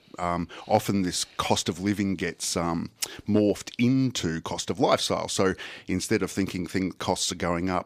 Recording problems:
none

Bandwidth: 14.5 kHz